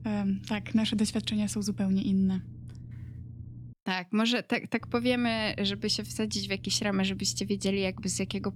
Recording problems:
low rumble; faint; until 3.5 s and from 5 s on; 25 dB below the speech

